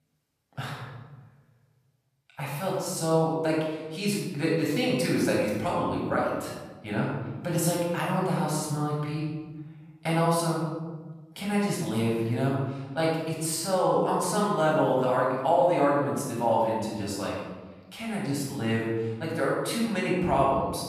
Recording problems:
room echo; strong; dies away in 1.4 s
off-mic speech; far

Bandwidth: 14.5 kHz